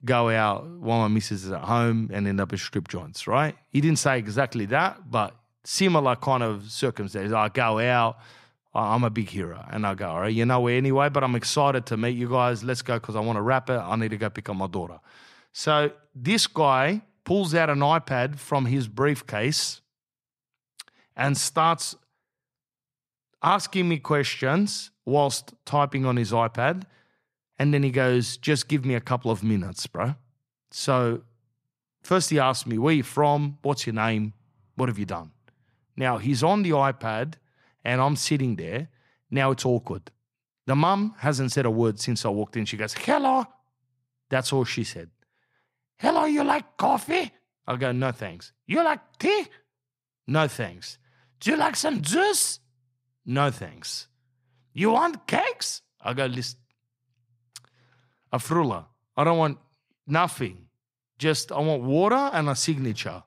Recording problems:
none

